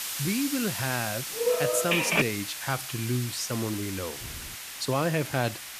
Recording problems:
hiss; loud; throughout; 4 dB below the speech
phone ringing; loud; at 1.5 s; peak 6 dB above the speech
door banging; faint; at 4 s; peak 15 dB below the speech

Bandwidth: 14.5 kHz